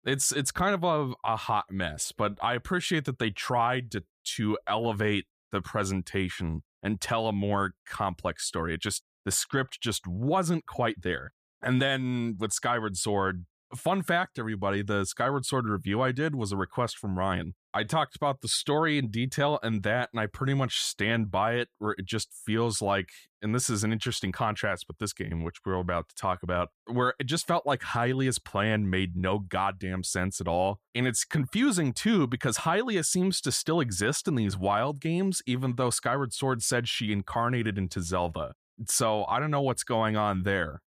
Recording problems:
none

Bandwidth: 14.5 kHz